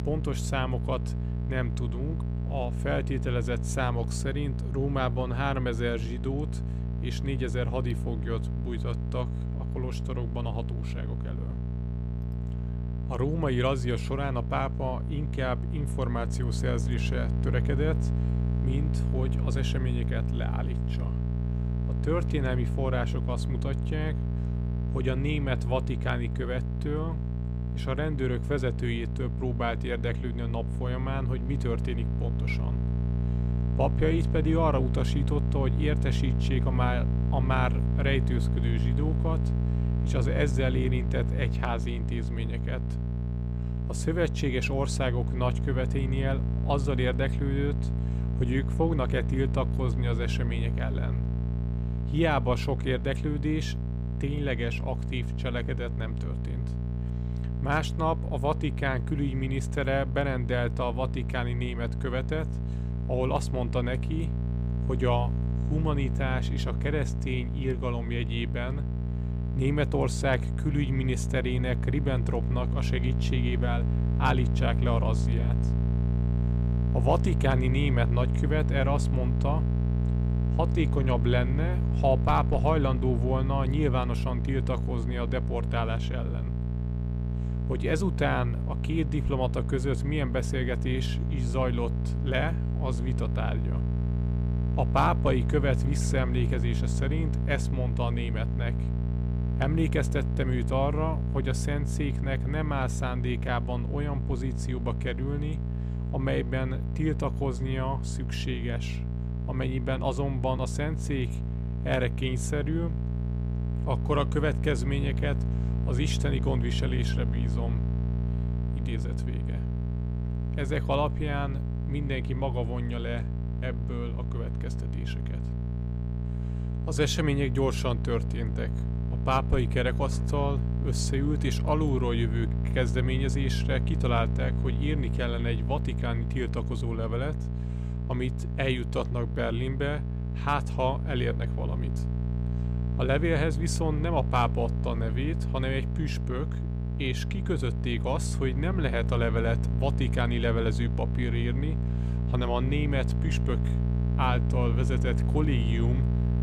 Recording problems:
electrical hum; loud; throughout; 60 Hz, 9 dB below the speech

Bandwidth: 15 kHz